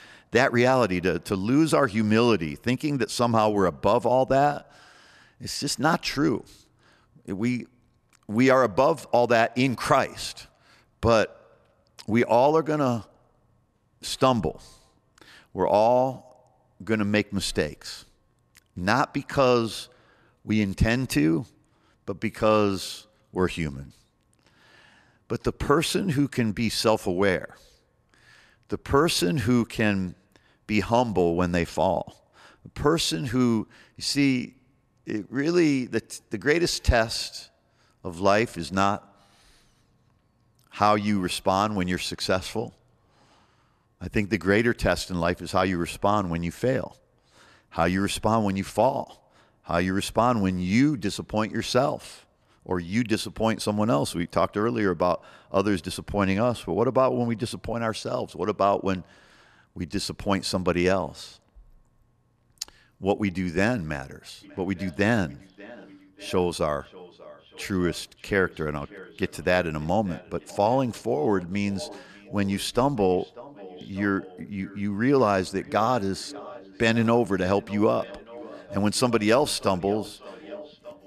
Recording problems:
echo of what is said; faint; from 1:04 on; 590 ms later, 20 dB below the speech

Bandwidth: 13.5 kHz